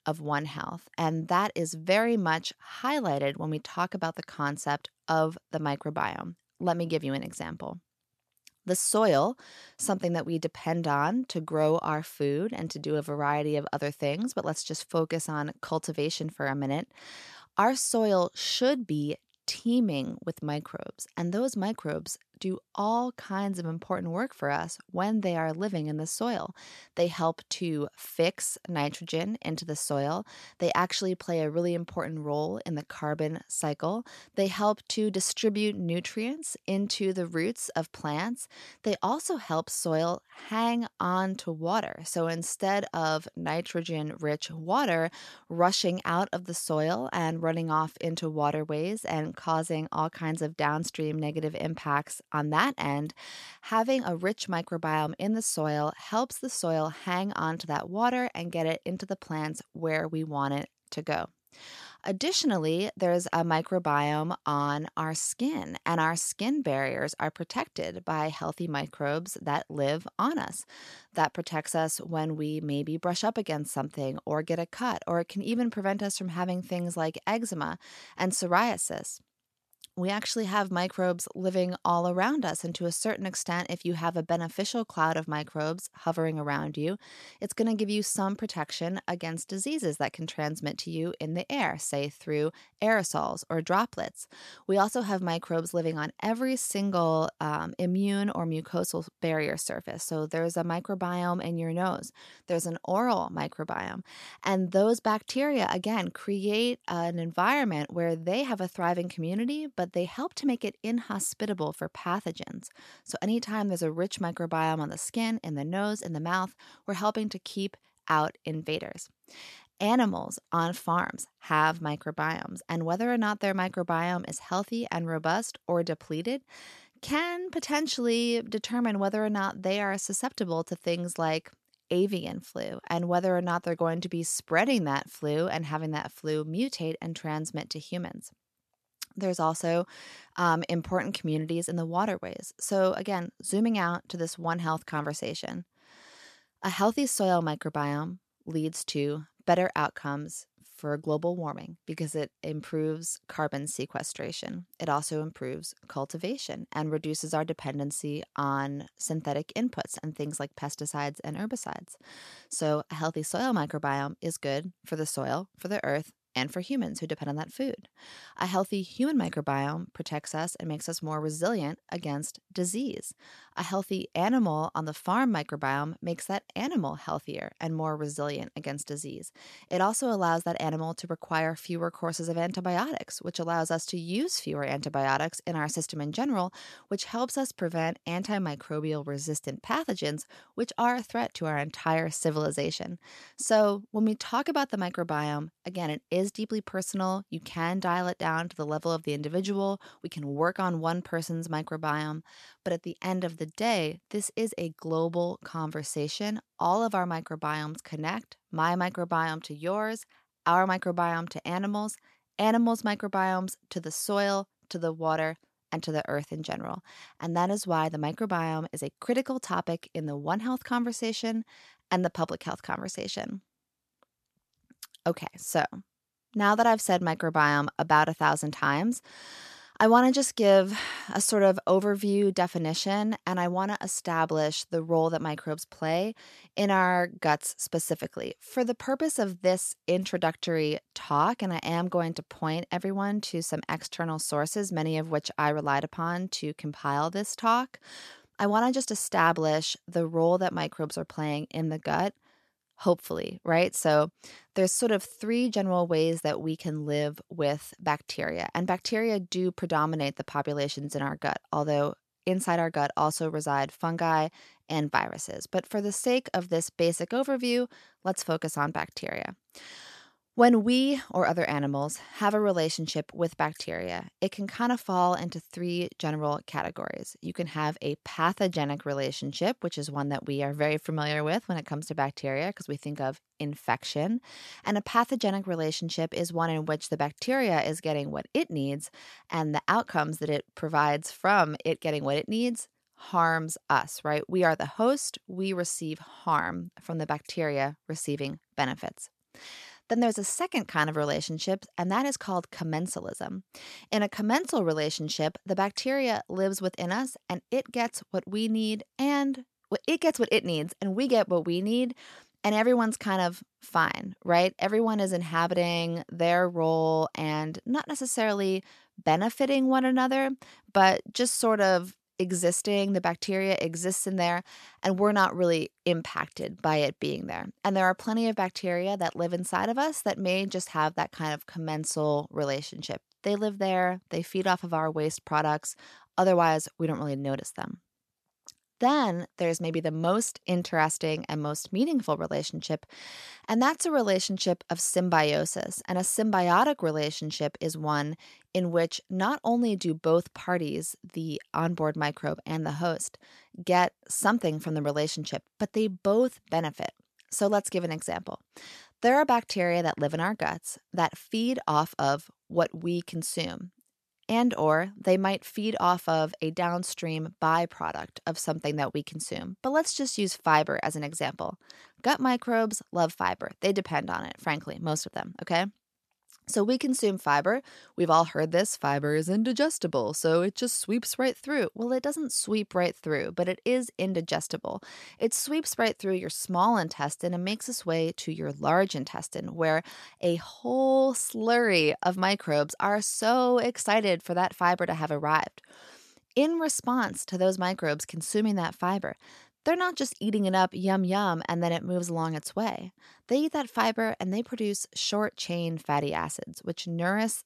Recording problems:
none

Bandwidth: 13.5 kHz